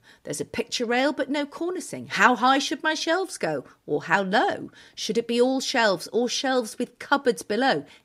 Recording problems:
none

